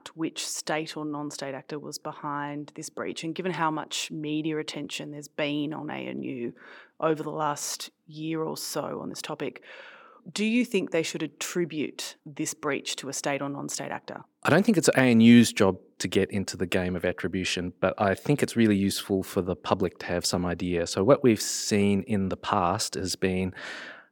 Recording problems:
none

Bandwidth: 17.5 kHz